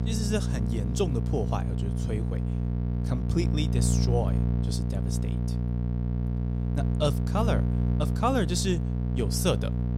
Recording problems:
electrical hum; loud; throughout; 60 Hz, 6 dB below the speech

